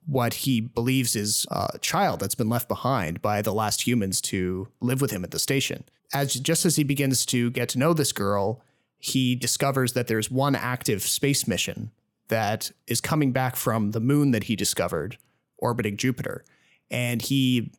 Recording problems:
none

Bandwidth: 17.5 kHz